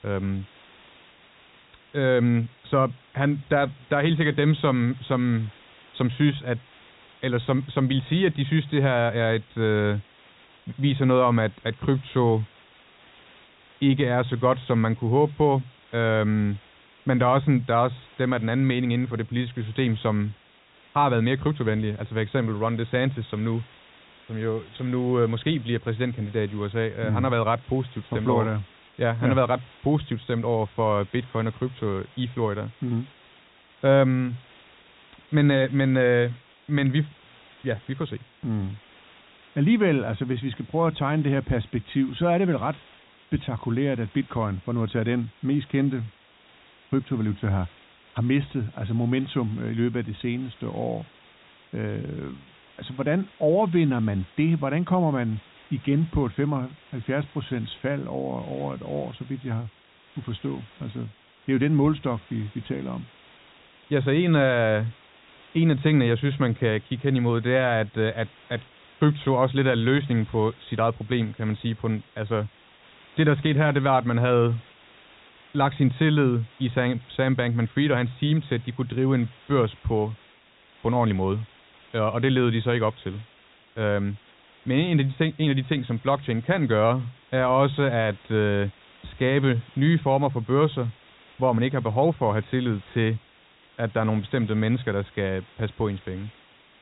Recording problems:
high frequencies cut off; severe; nothing above 4 kHz
hiss; faint; throughout; 25 dB below the speech

